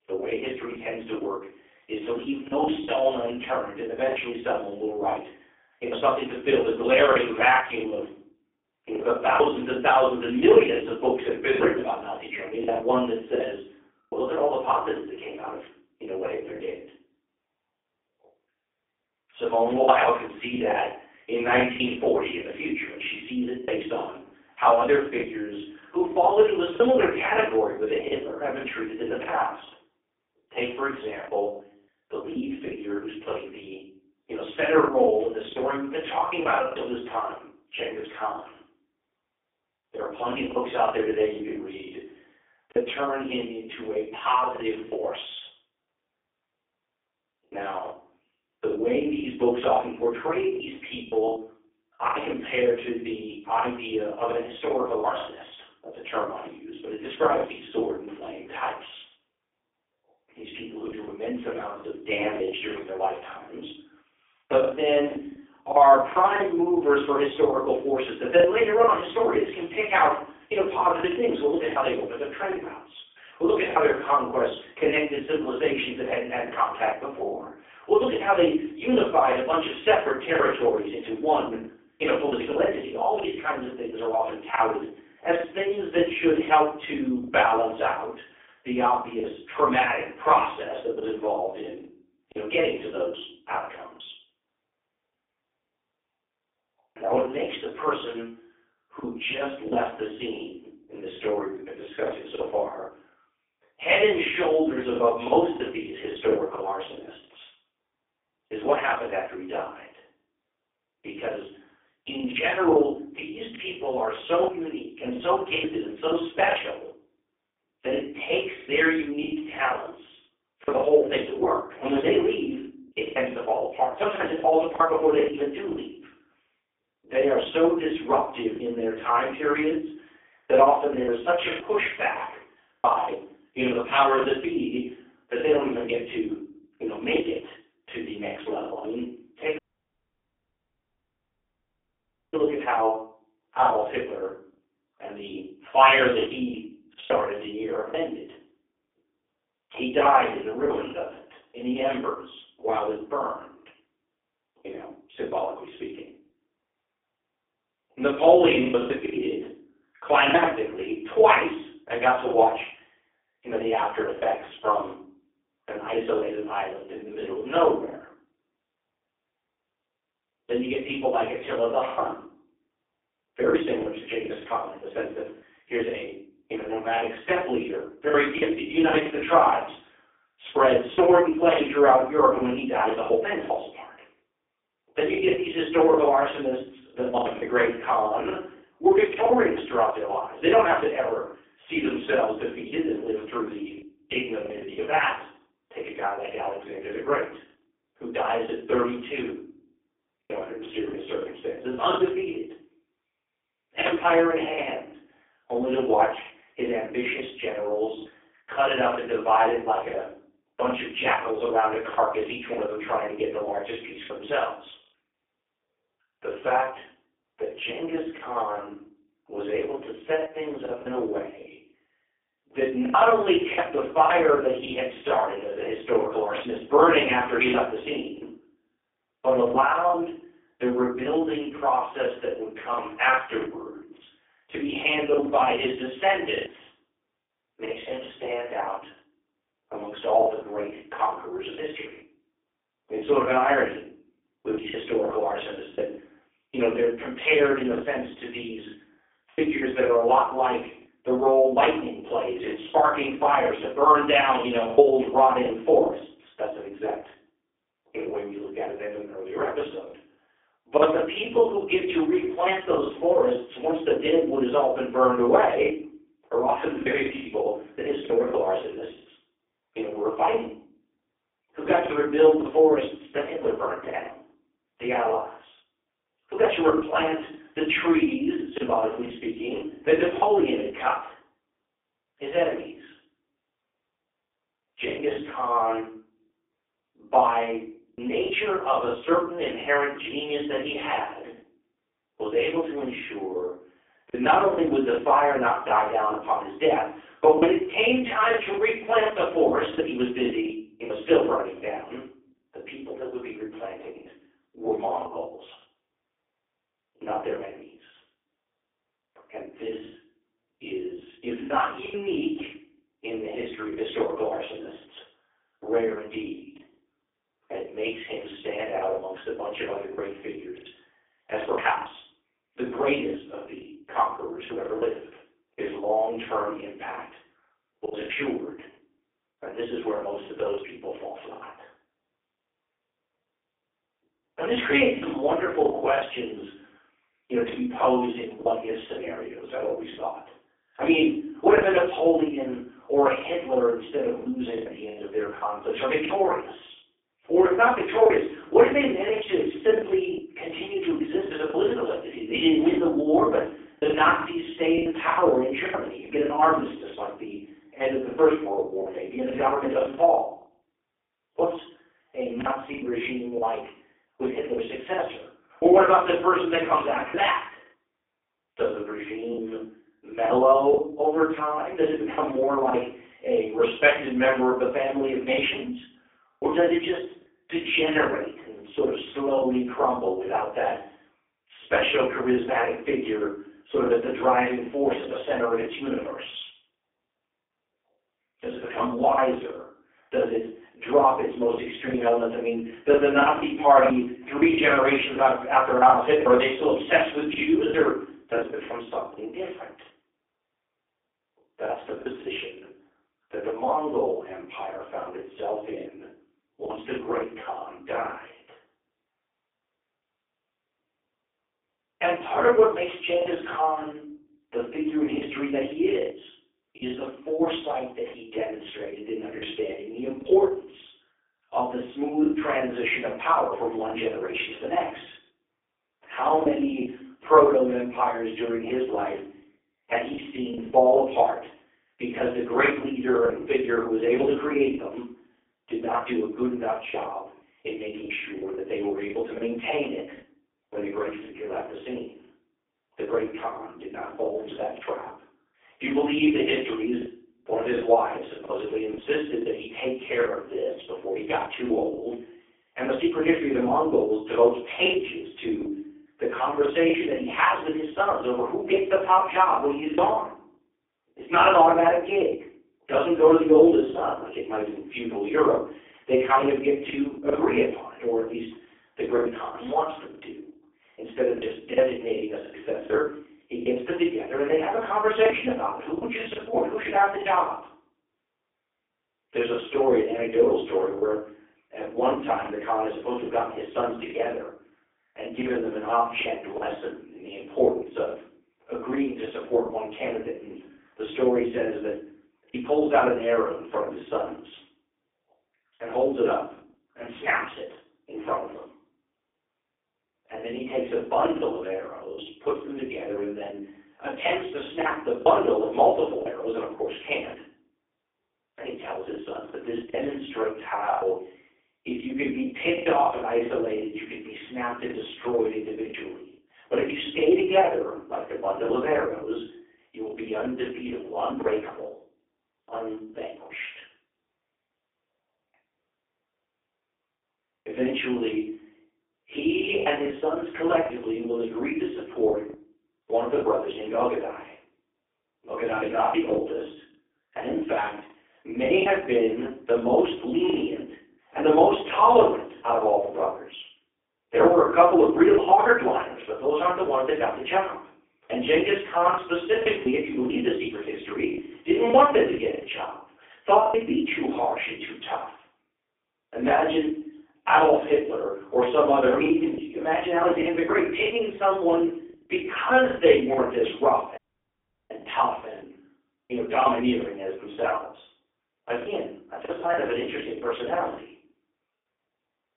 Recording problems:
phone-call audio; poor line; nothing above 3.5 kHz
off-mic speech; far
room echo; noticeable; dies away in 0.5 s
choppy; very; 6% of the speech affected
audio cutting out; at 2:20 for 2.5 s and at 9:24 for 0.5 s

